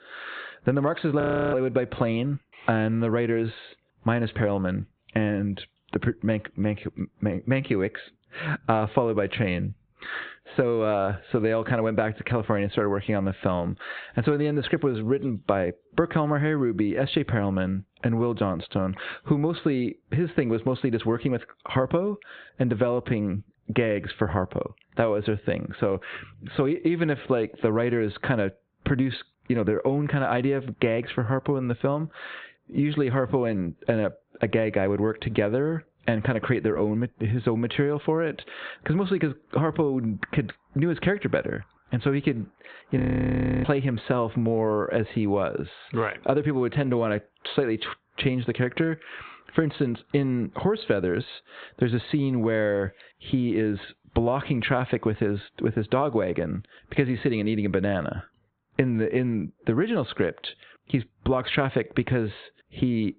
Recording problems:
high frequencies cut off; severe; nothing above 4 kHz
squashed, flat; heavily
audio freezing; at 1 s and at 43 s for 0.5 s

